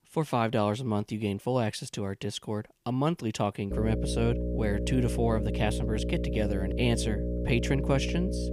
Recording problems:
electrical hum; loud; from 3.5 s on; 60 Hz, 5 dB below the speech

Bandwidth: 15 kHz